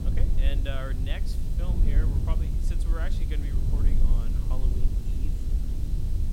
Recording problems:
low rumble; loud; throughout; 3 dB below the speech
high-pitched whine; noticeable; throughout; 4 kHz, 20 dB below the speech
hiss; noticeable; throughout; 10 dB below the speech

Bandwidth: 16.5 kHz